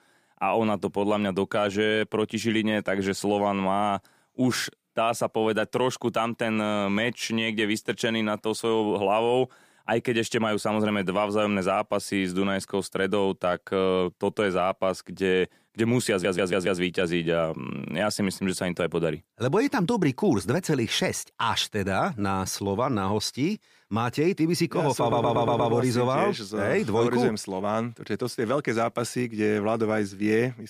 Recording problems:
audio stuttering; at 16 s and at 25 s

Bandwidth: 15 kHz